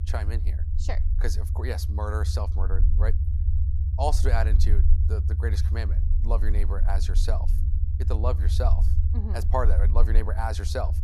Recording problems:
low rumble; loud; throughout; 10 dB below the speech

